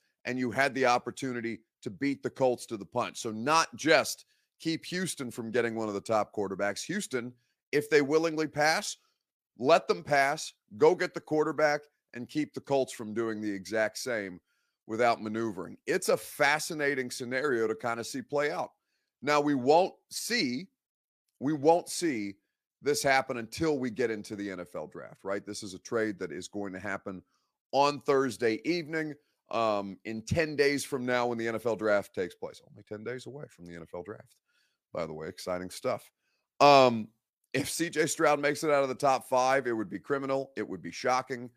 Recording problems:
none

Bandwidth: 15 kHz